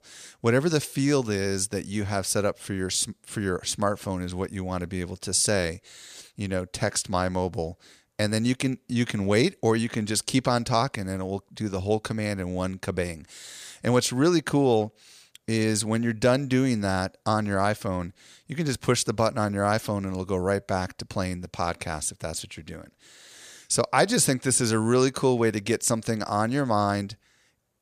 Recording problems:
none

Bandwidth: 14.5 kHz